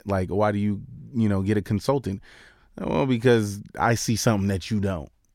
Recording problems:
none

